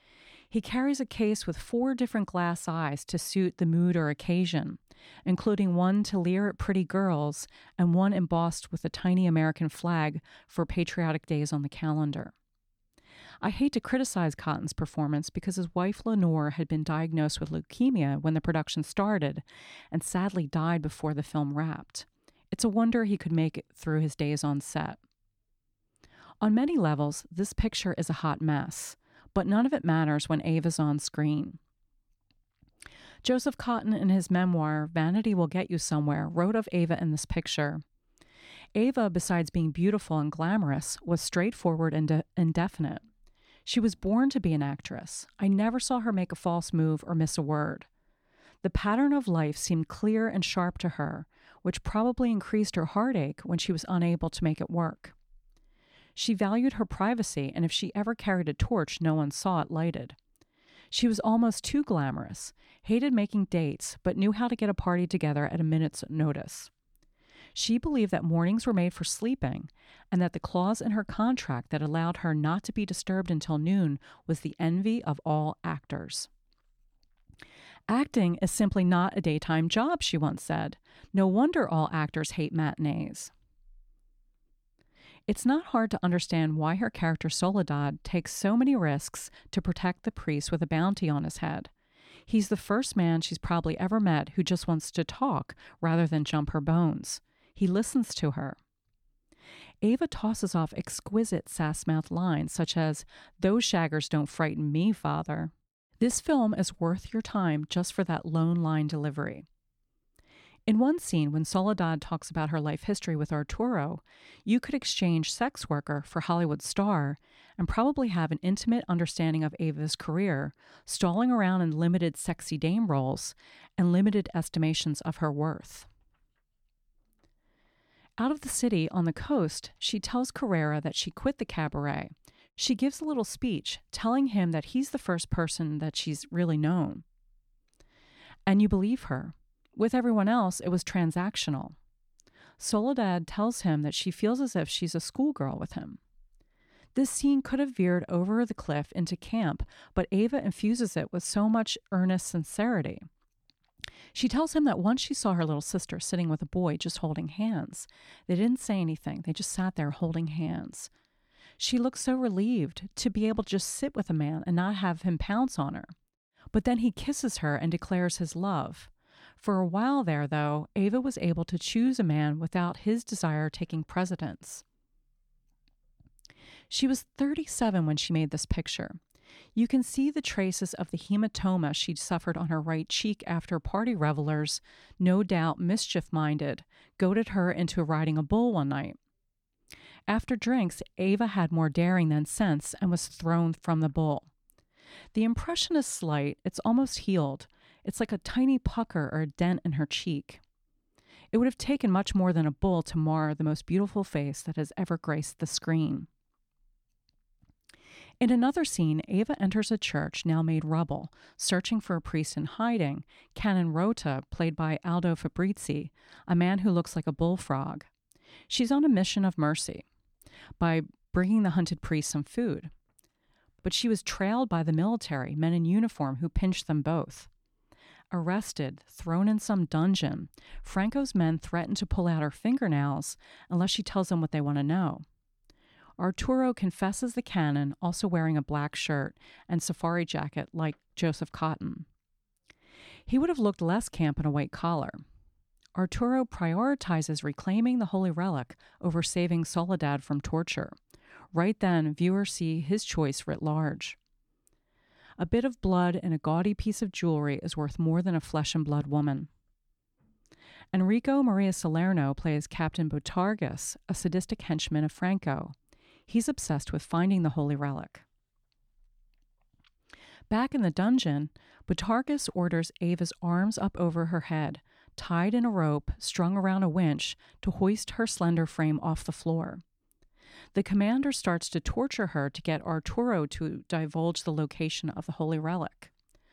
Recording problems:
none

